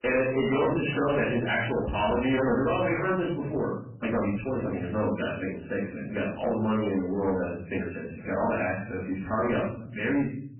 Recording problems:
off-mic speech; far
garbled, watery; badly; nothing above 3 kHz
room echo; noticeable; dies away in 0.5 s
distortion; slight; 11% of the sound clipped
uneven, jittery; strongly; from 0.5 to 10 s

